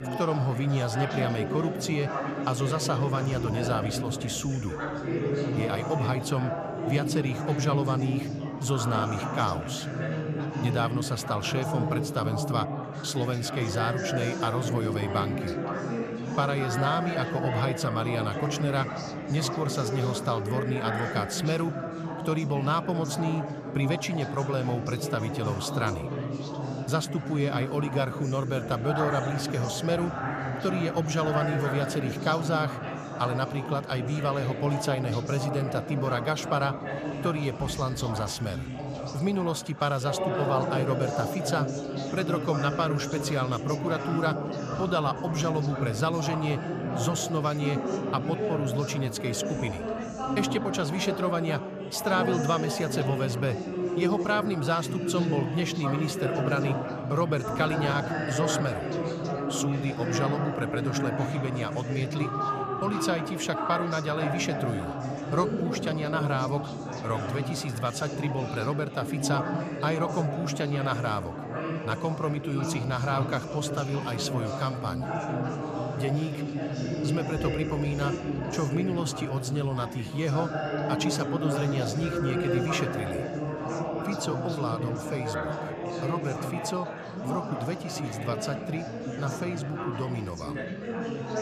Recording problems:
chatter from many people; loud; throughout; 2 dB below the speech

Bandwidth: 14.5 kHz